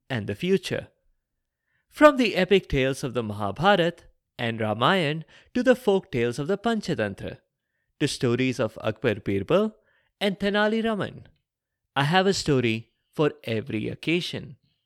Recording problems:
none

